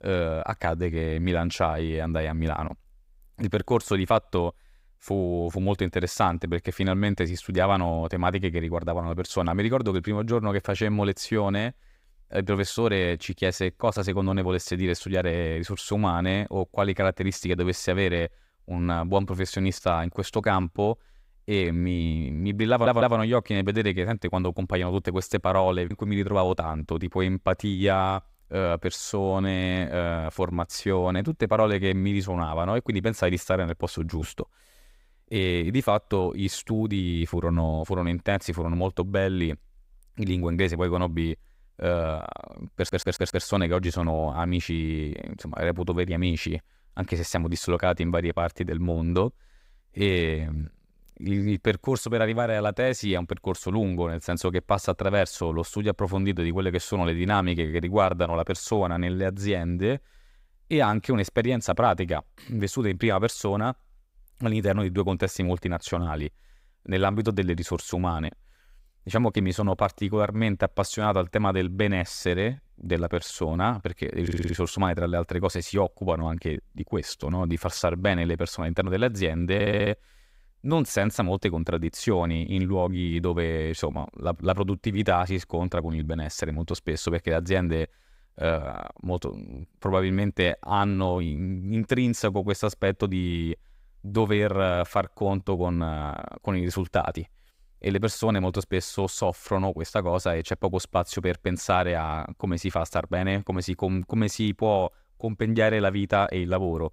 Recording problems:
audio stuttering; 4 times, first at 23 s

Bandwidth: 15.5 kHz